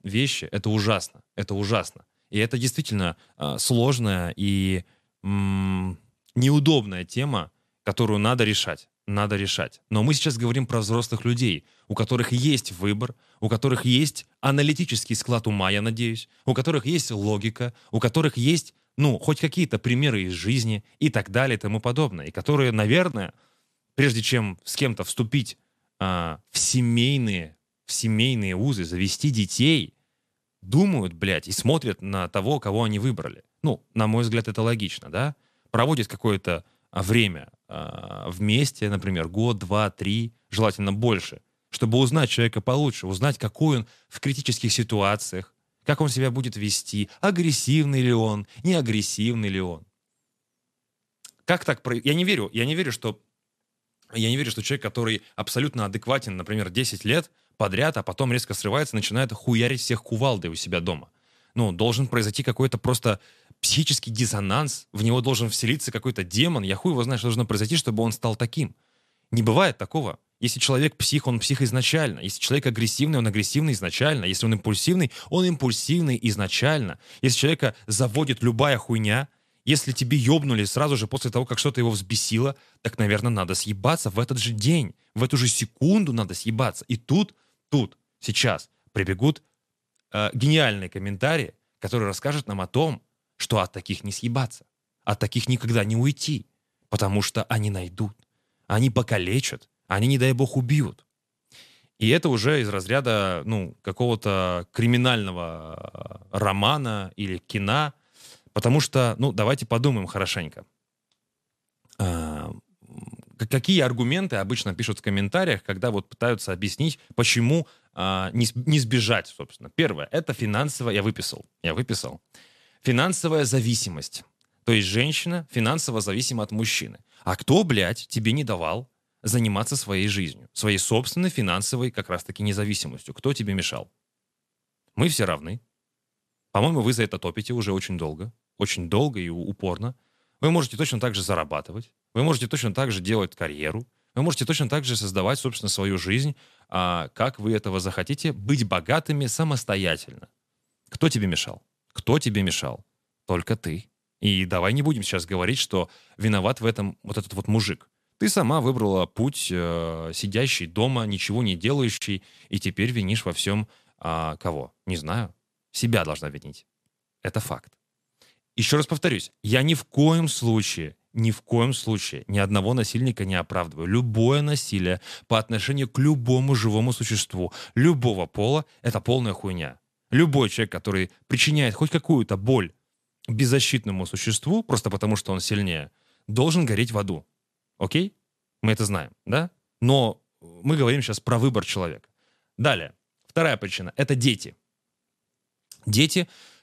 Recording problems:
none

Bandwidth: 14 kHz